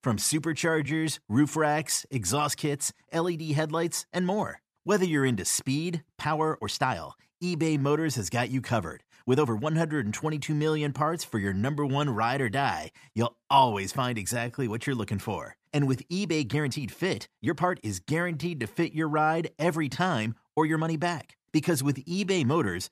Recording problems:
uneven, jittery; strongly; from 1 to 22 s

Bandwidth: 14.5 kHz